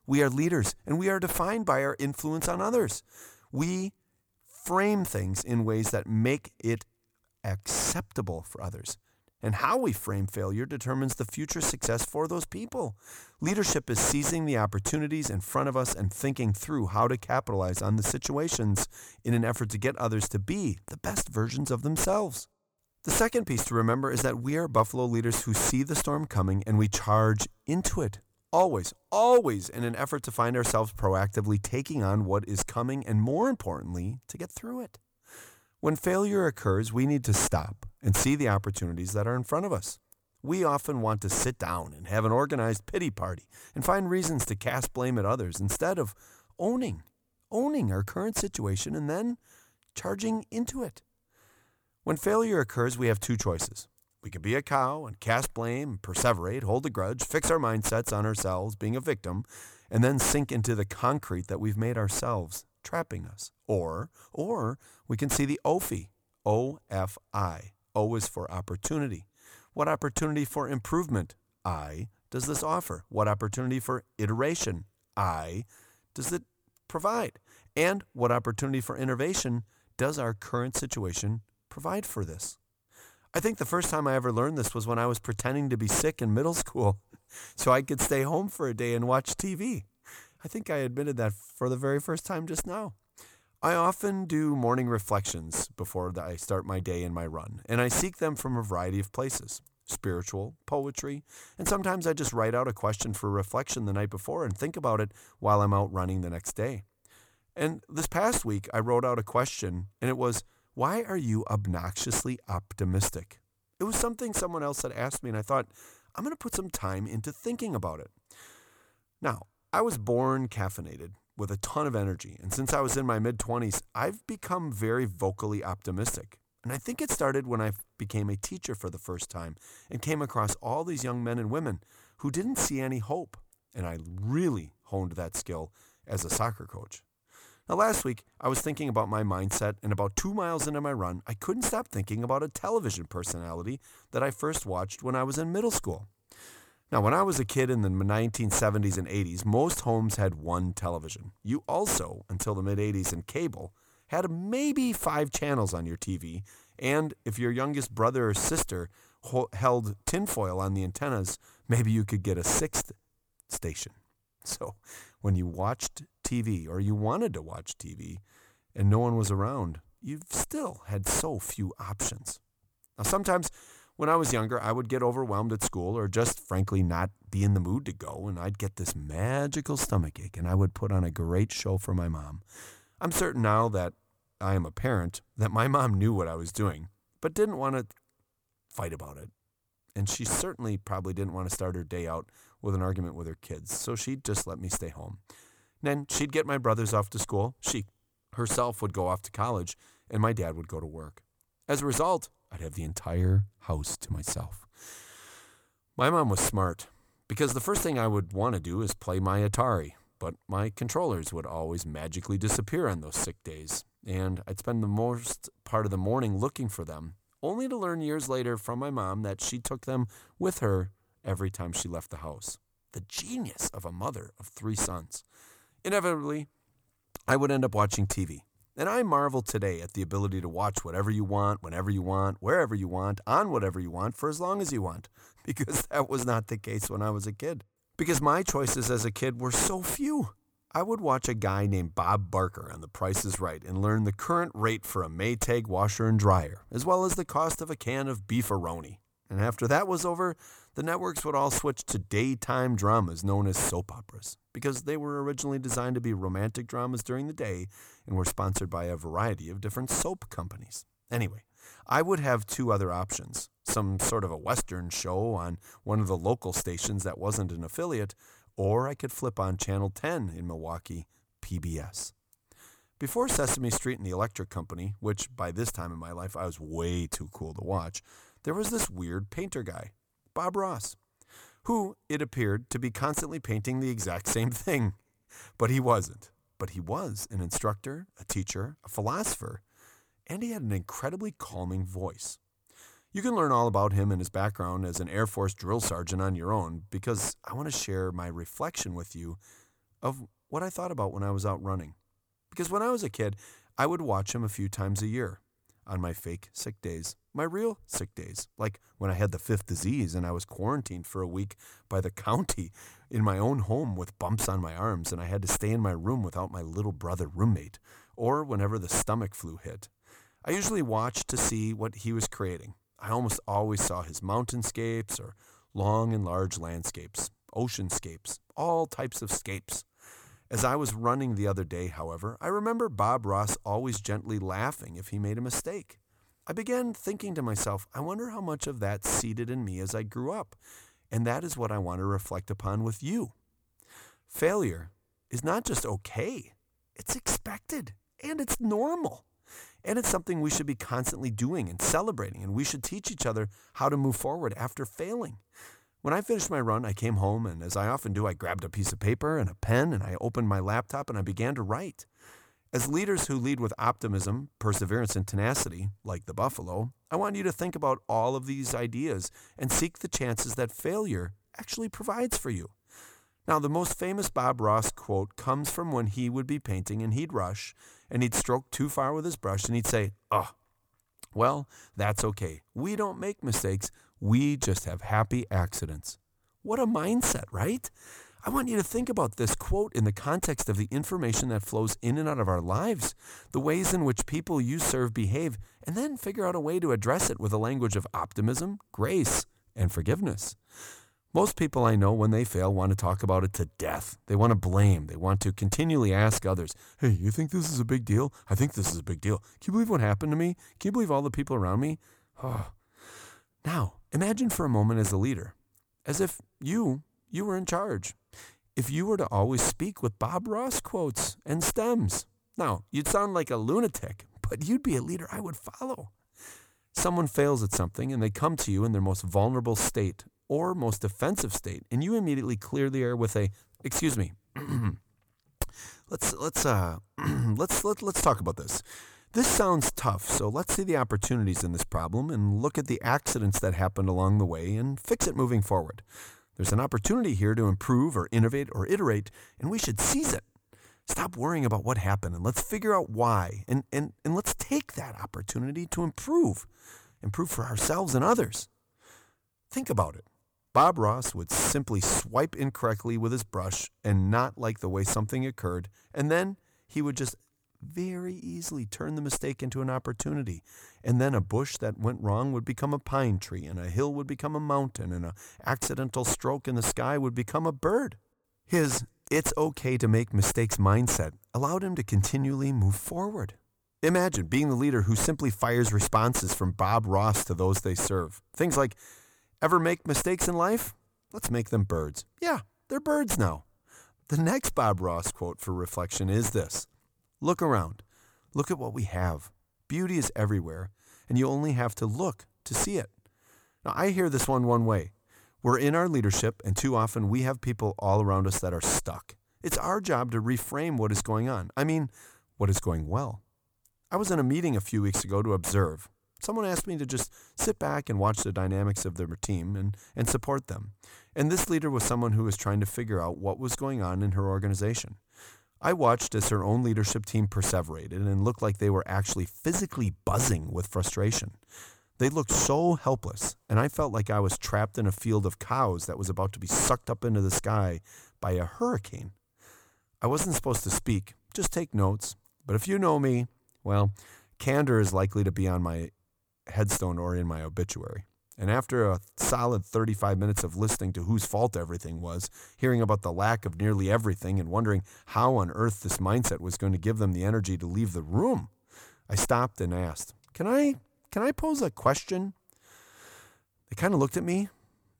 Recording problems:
distortion; slight; 8 dB below the speech

